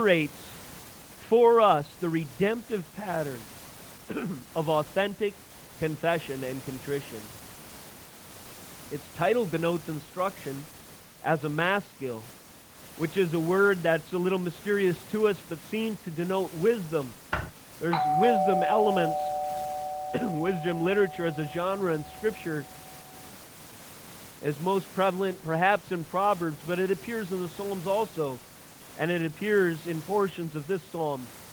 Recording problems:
muffled; very; fading above 3 kHz
garbled, watery; slightly
hiss; noticeable; throughout; 20 dB below the speech
abrupt cut into speech; at the start
keyboard typing; noticeable; at 17 s; peak 6 dB below the speech
doorbell; loud; from 18 to 21 s; peak 4 dB above the speech

